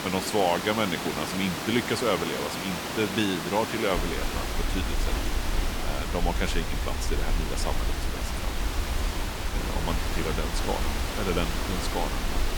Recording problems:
hiss; loud; throughout; 2 dB below the speech
low rumble; faint; from 4 s on; 25 dB below the speech

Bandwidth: 19 kHz